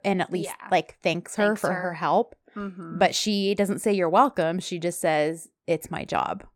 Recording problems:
none

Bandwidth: 17 kHz